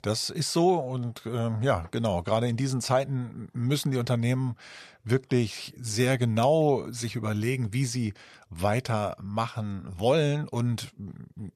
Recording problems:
none

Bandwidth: 13.5 kHz